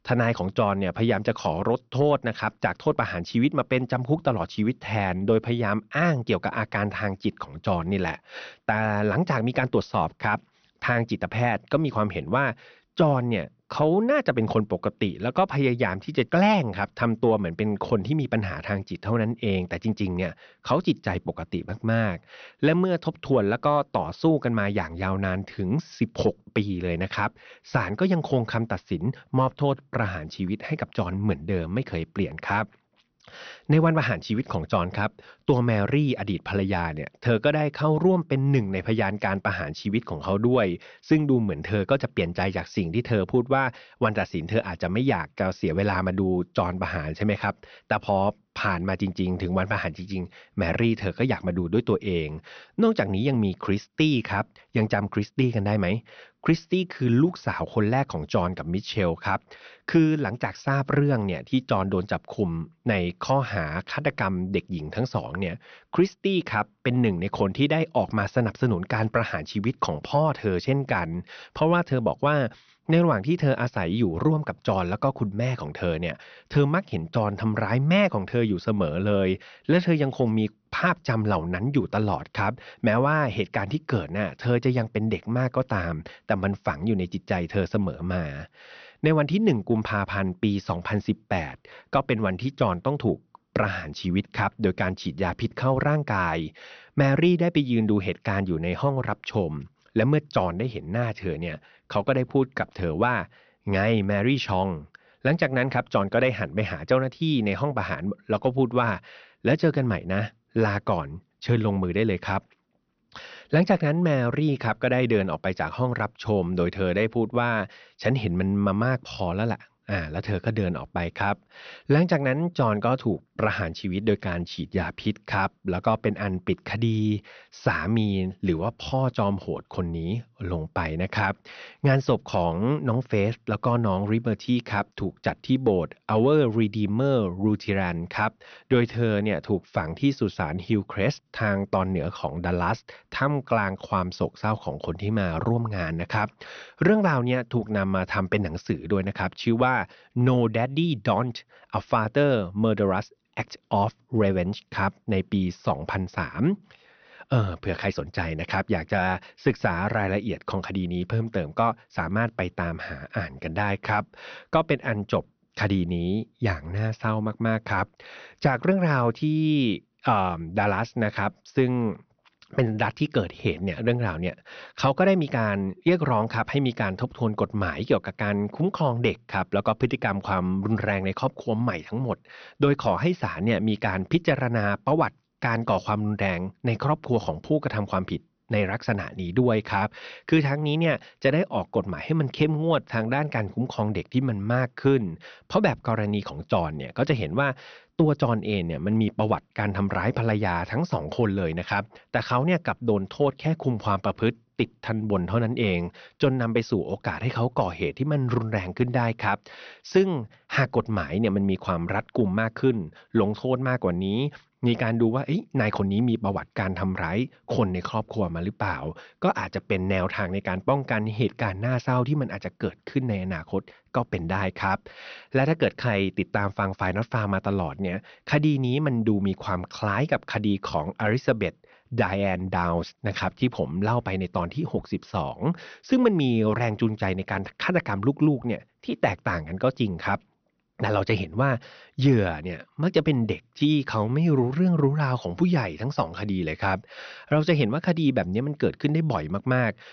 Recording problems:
high frequencies cut off; noticeable; nothing above 6 kHz

